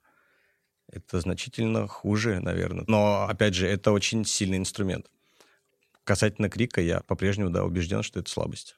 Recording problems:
none

